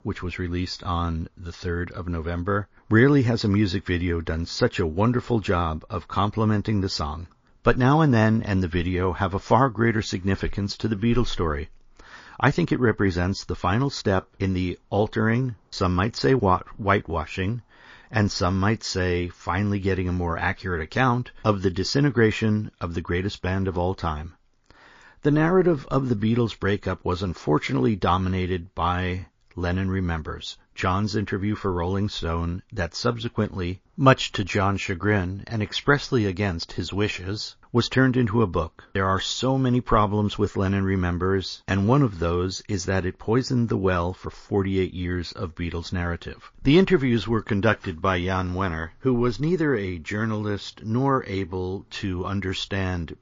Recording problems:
garbled, watery; slightly; nothing above 16 kHz

